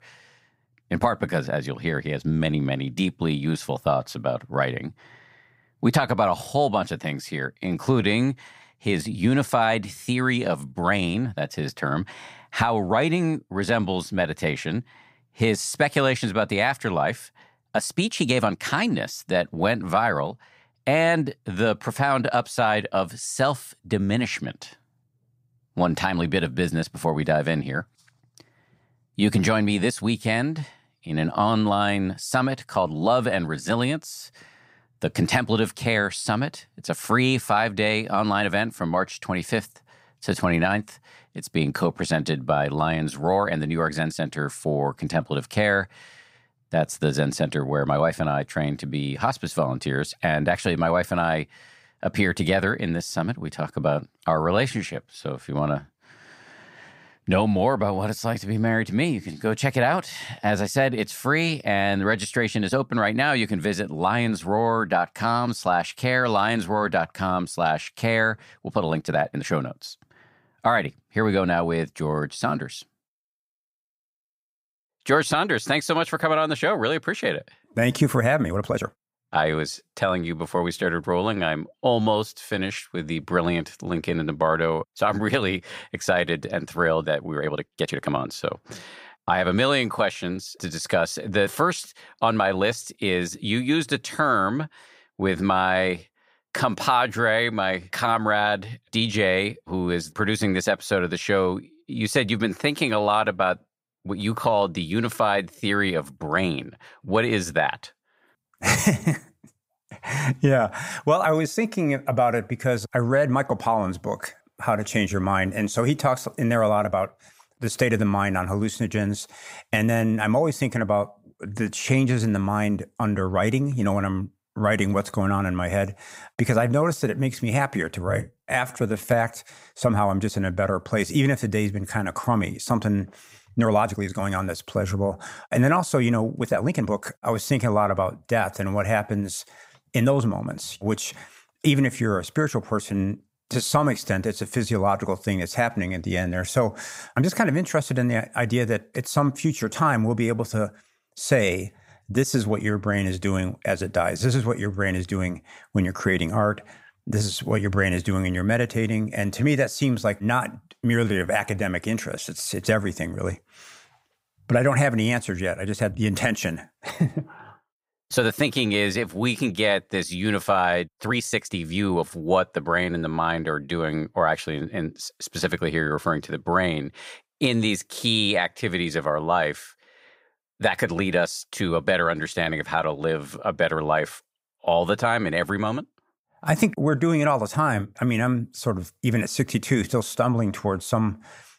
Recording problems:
uneven, jittery; strongly; from 7.5 s to 2:52

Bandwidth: 15.5 kHz